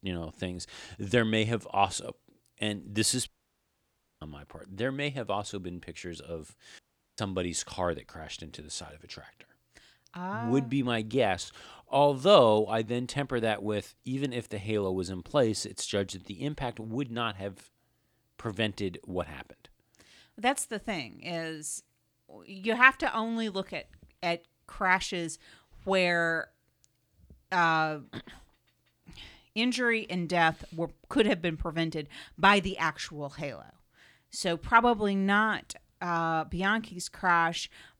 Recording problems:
audio cutting out; at 3.5 s for 1 s and at 7 s

